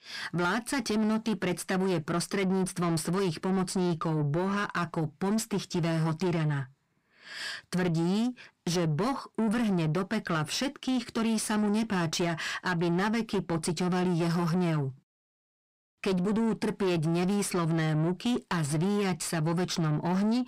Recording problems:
distortion; slight; 10 dB below the speech

